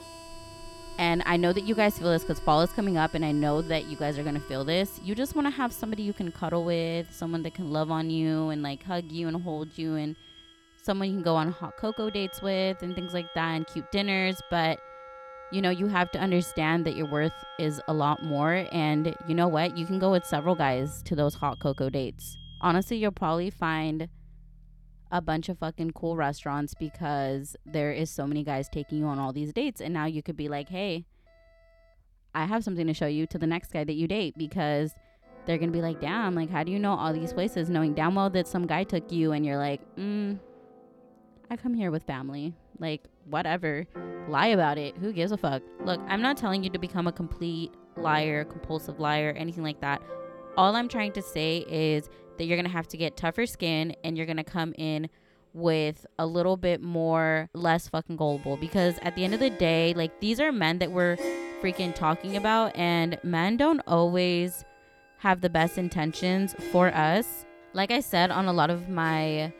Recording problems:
background music; noticeable; throughout; 15 dB below the speech
alarms or sirens; faint; throughout; 25 dB below the speech

